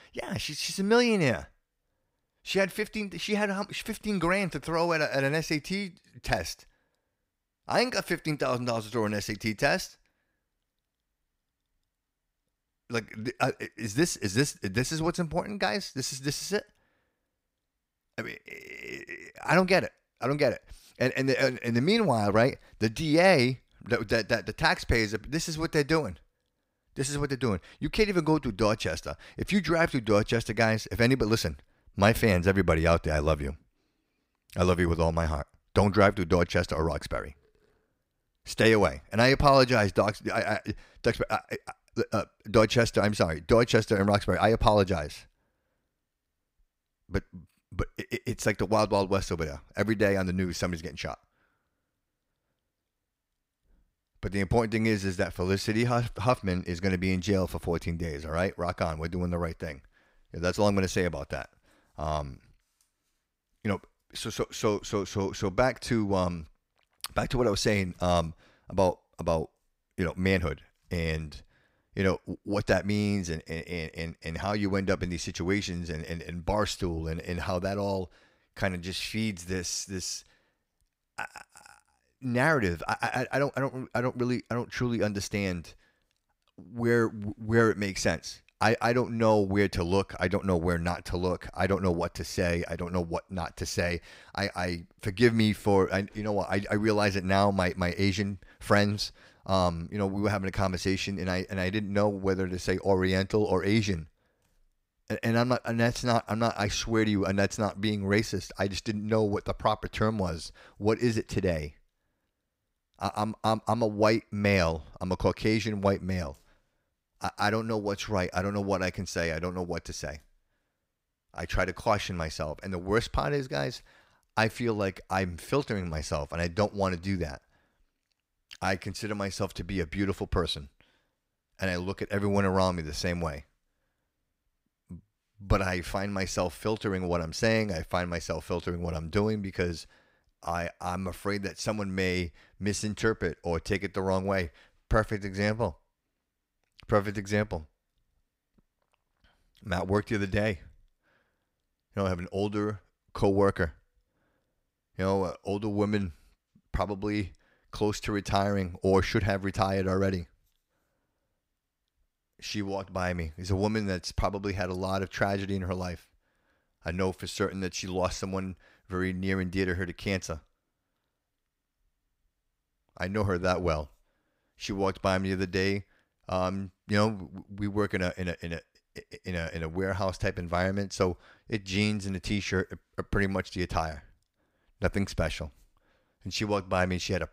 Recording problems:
none

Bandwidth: 15.5 kHz